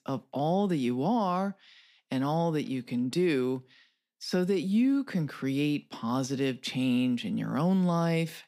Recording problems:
none

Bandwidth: 15.5 kHz